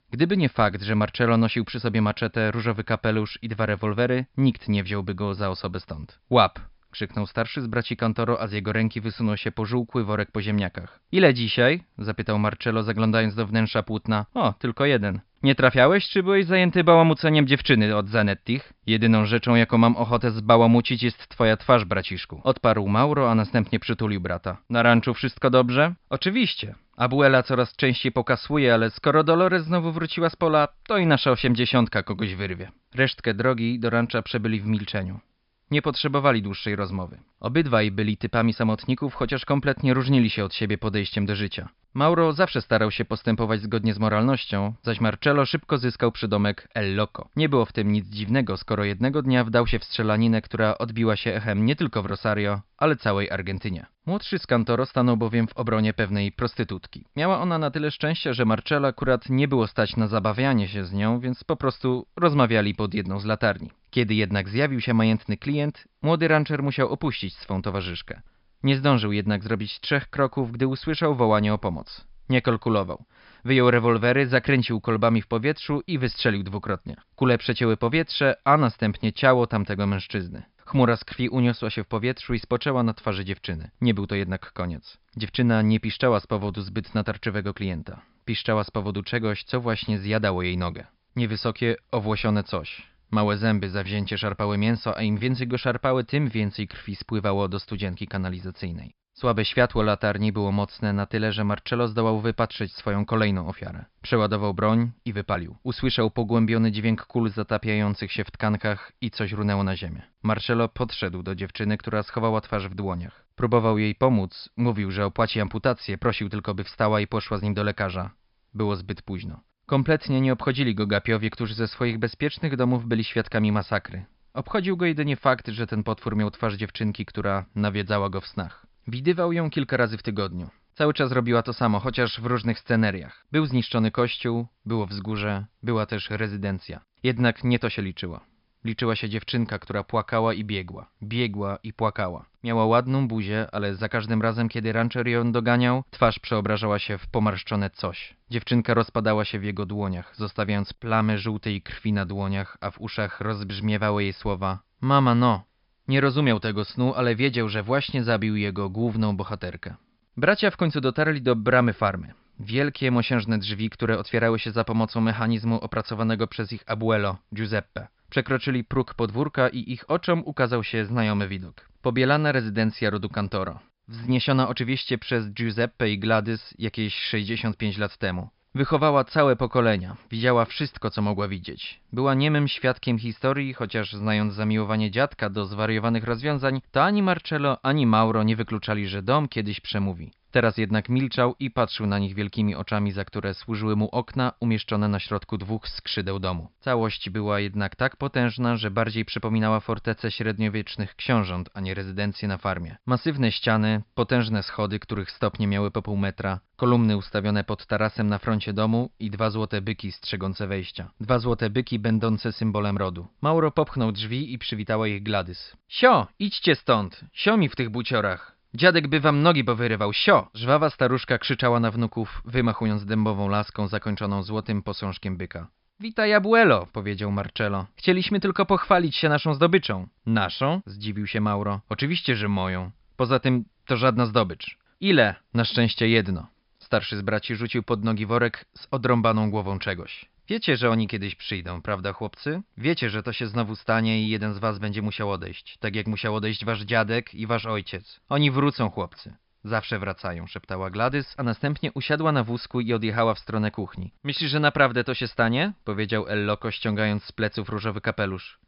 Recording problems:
high frequencies cut off; noticeable; nothing above 5.5 kHz

